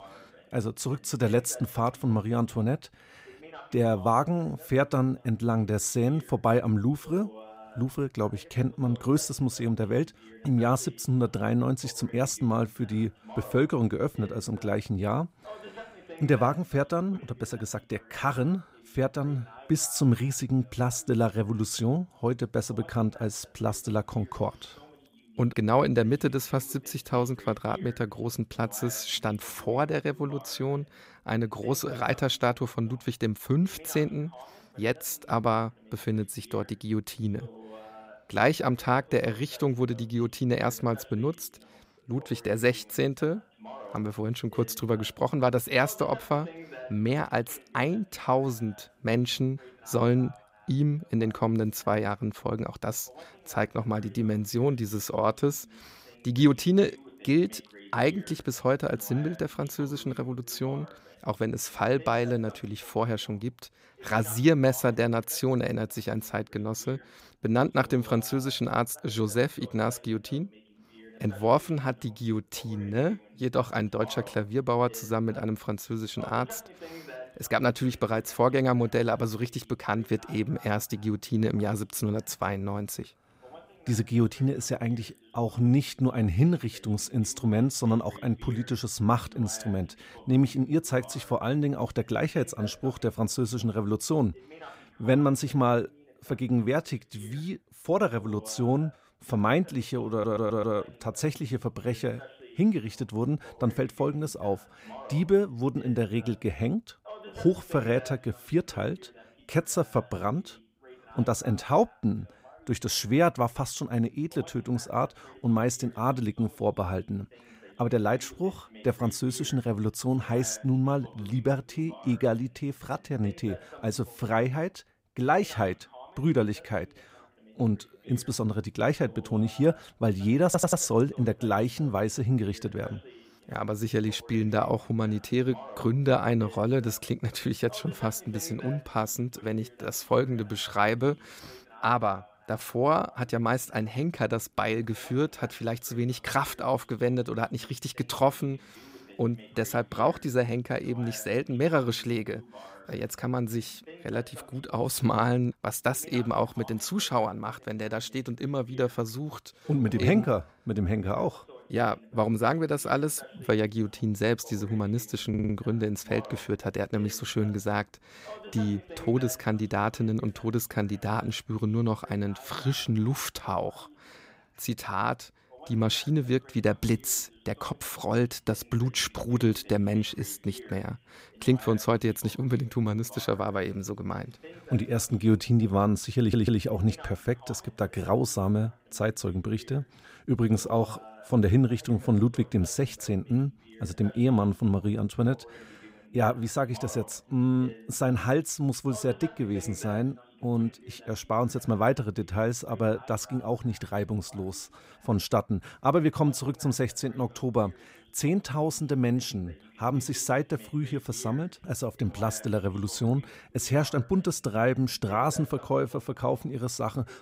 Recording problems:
voice in the background; faint; throughout; 20 dB below the speech
audio stuttering; 4 times, first at 1:40

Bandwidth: 15.5 kHz